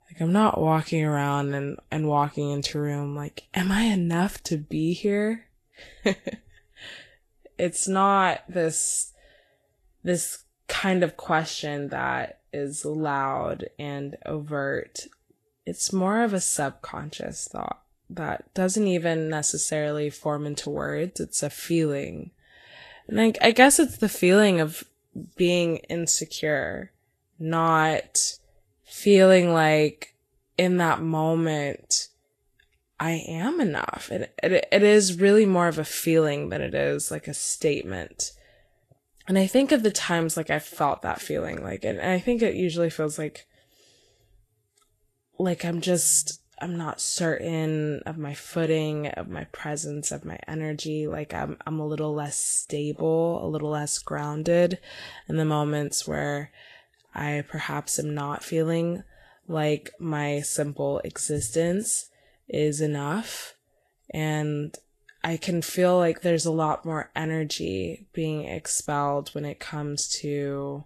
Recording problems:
garbled, watery; slightly; nothing above 12.5 kHz

